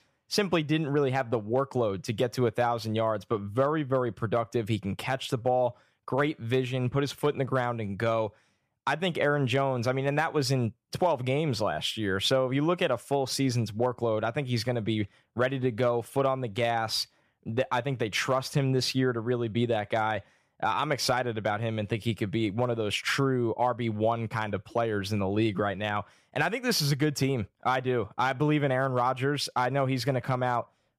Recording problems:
none

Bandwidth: 14.5 kHz